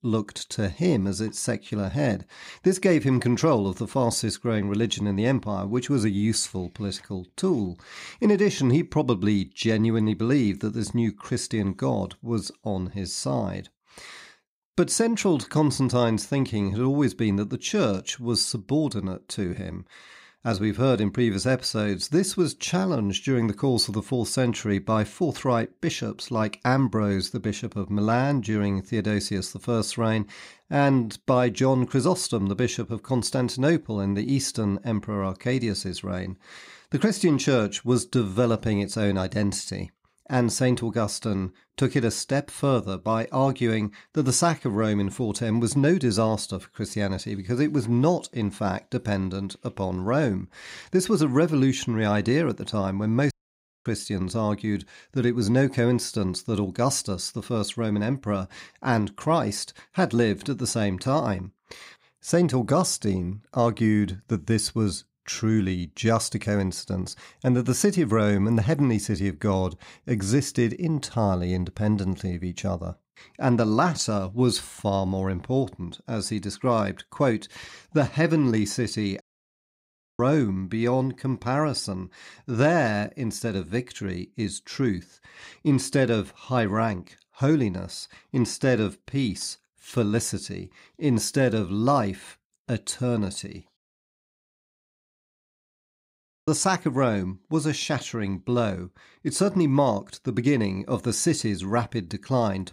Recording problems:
audio cutting out; at 53 s for 0.5 s, at 1:19 for 1 s and at 1:34 for 2.5 s

